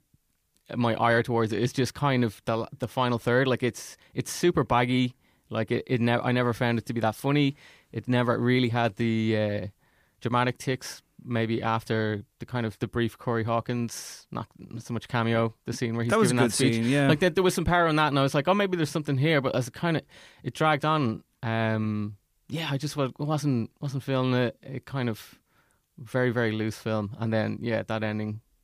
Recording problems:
none

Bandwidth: 15 kHz